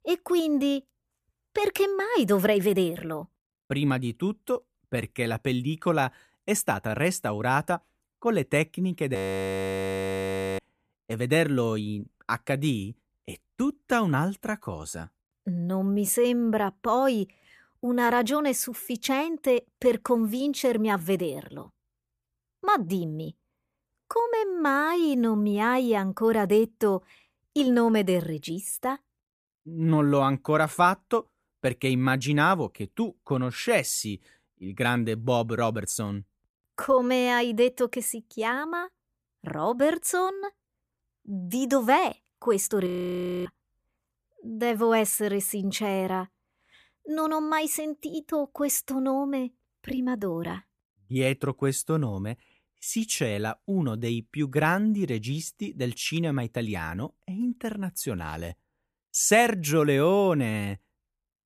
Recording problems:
audio freezing; at 9 s for 1.5 s and at 43 s for 0.5 s

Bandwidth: 14.5 kHz